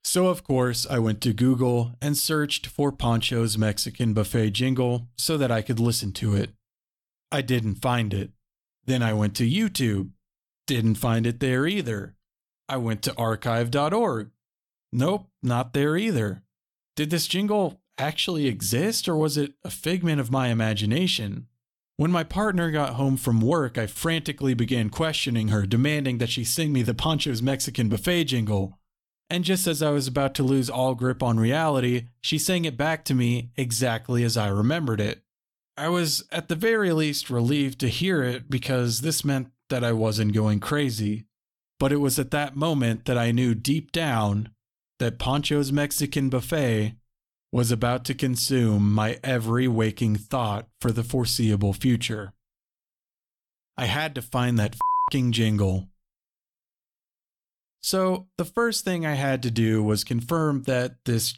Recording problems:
none

